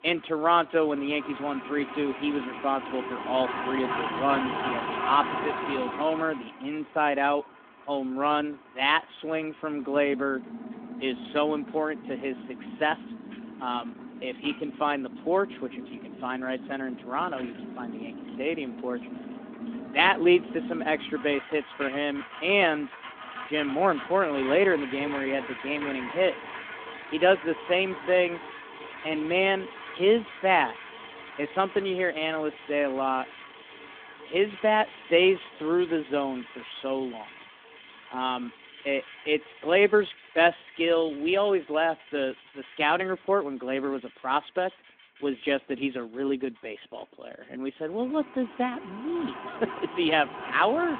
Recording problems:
phone-call audio; nothing above 3.5 kHz
traffic noise; noticeable; throughout; 10 dB below the speech

